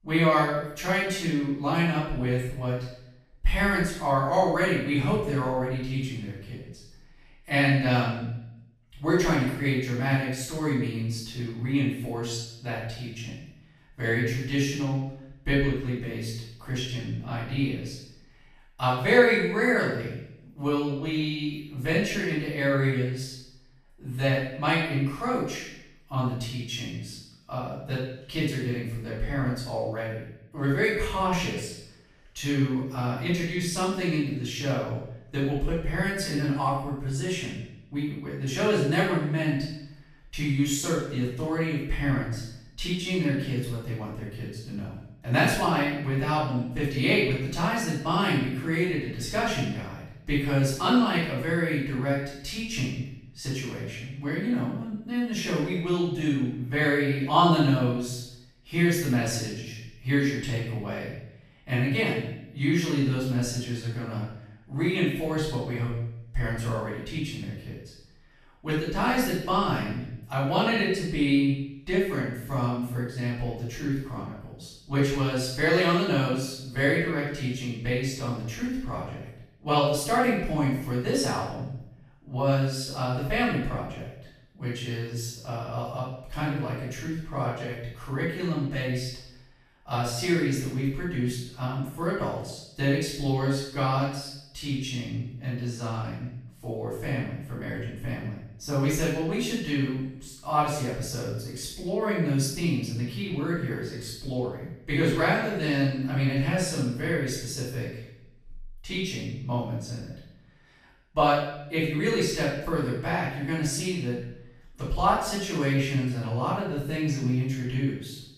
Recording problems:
off-mic speech; far
room echo; noticeable; dies away in 0.7 s

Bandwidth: 14.5 kHz